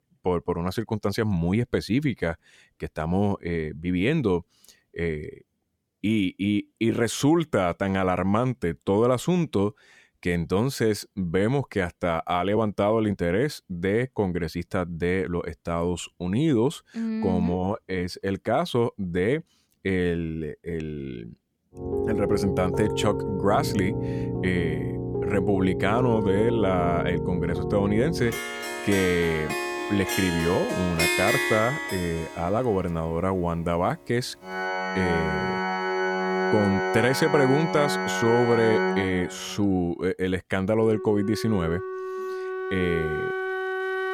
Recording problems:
background music; loud; from 22 s on; 2 dB below the speech

